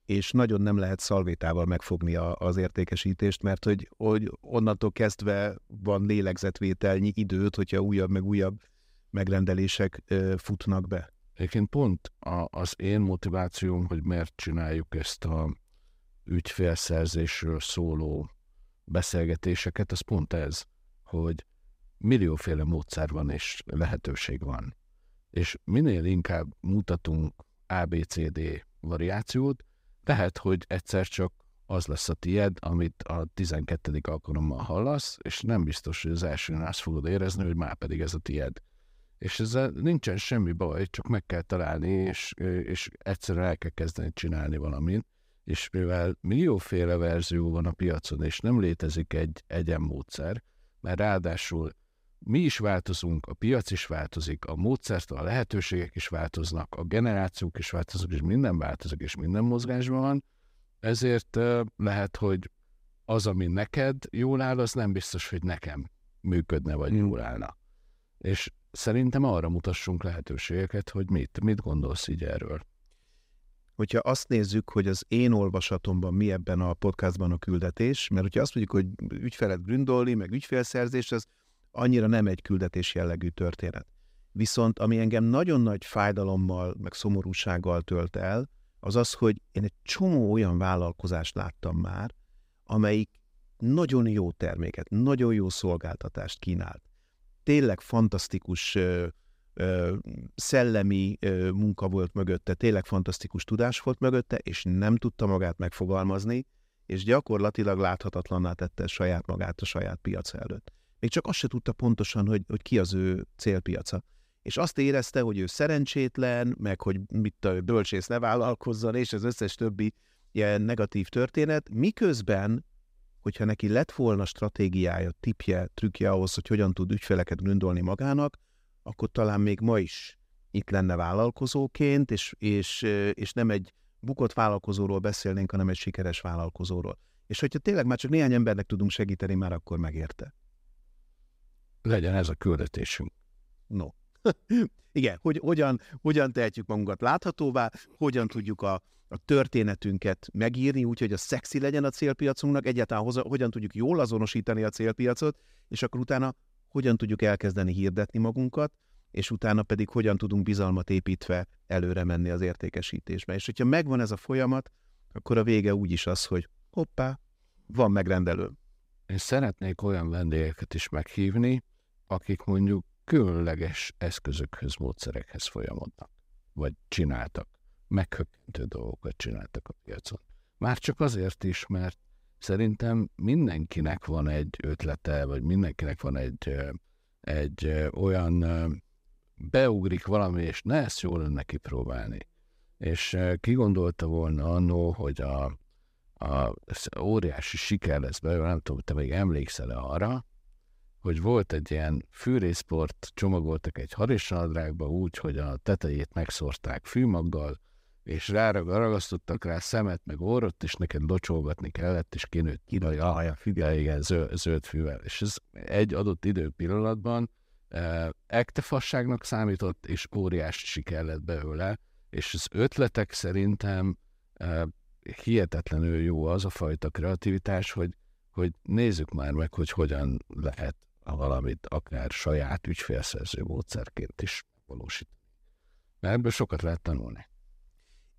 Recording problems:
none

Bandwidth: 15.5 kHz